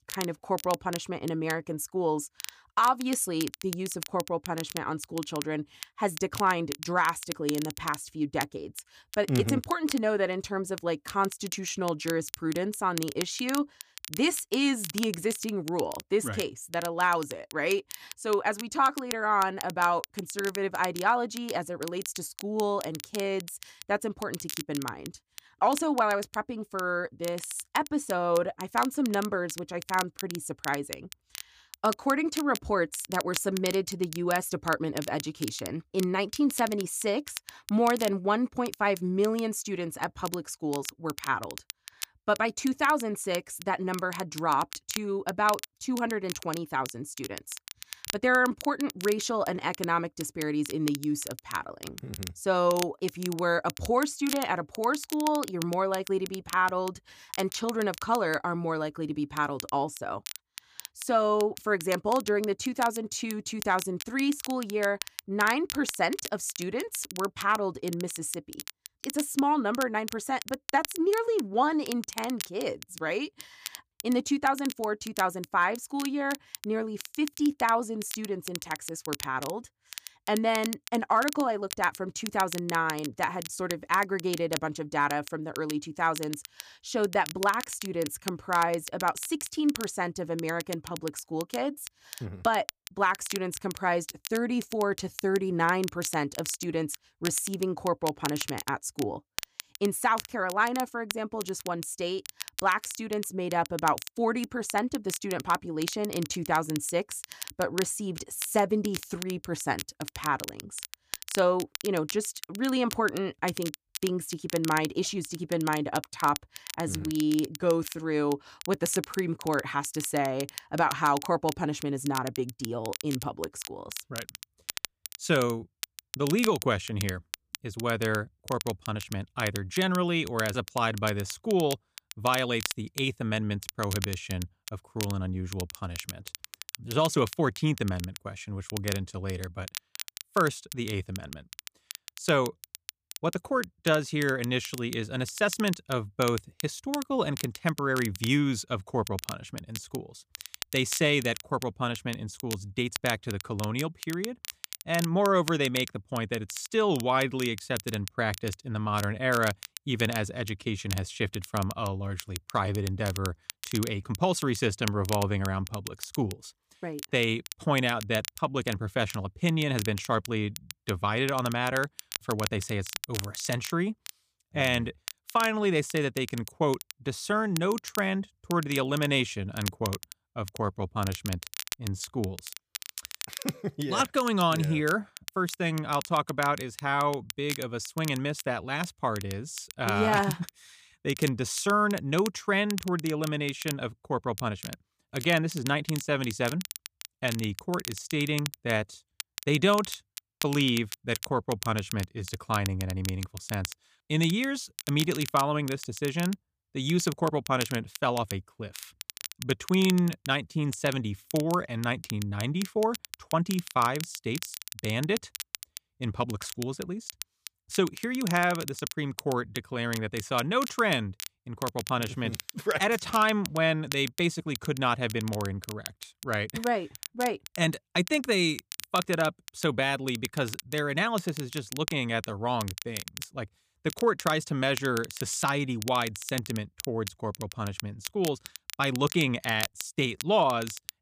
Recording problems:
crackle, like an old record; noticeable; 10 dB below the speech

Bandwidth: 15 kHz